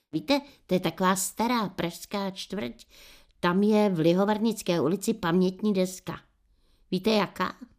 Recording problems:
none

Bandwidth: 15 kHz